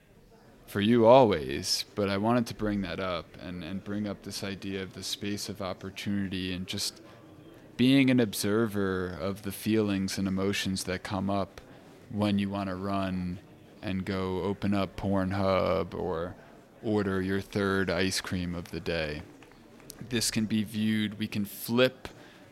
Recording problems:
murmuring crowd; faint; throughout; 25 dB below the speech

